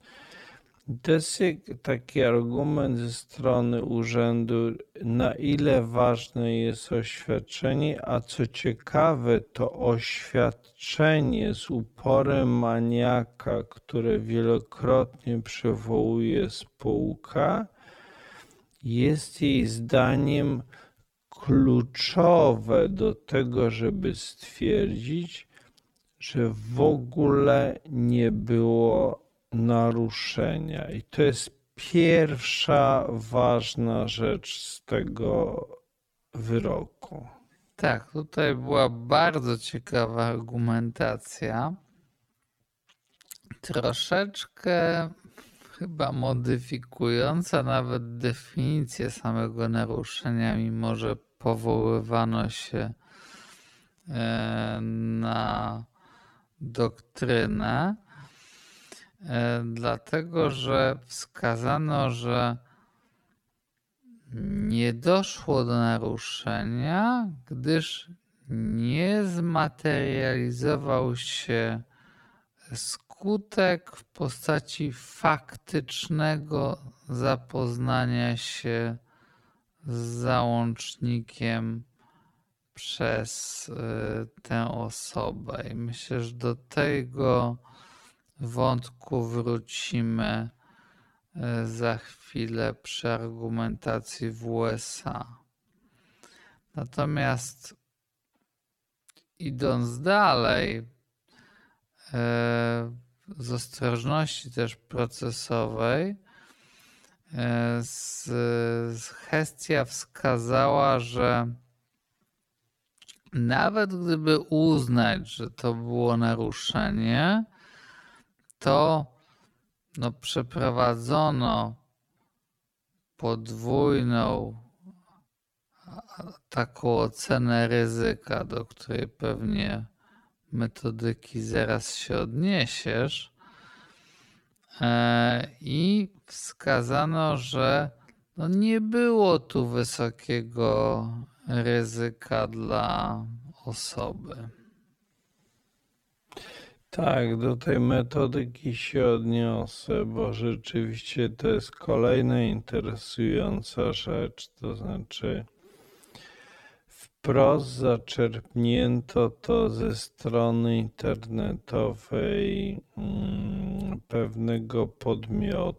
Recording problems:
wrong speed, natural pitch; too slow; 0.5 times normal speed

